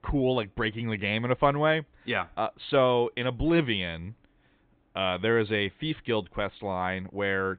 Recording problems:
high frequencies cut off; severe; nothing above 4 kHz

